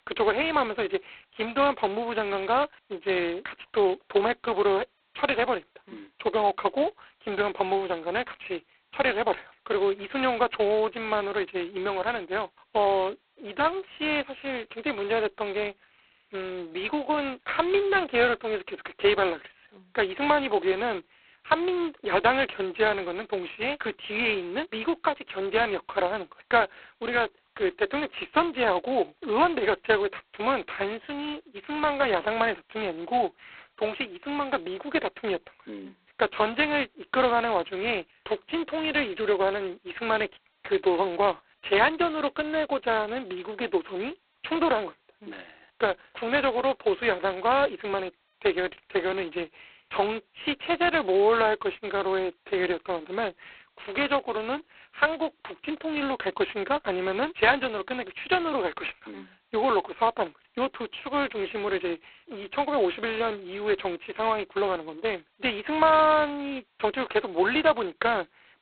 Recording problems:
phone-call audio; poor line; nothing above 4 kHz

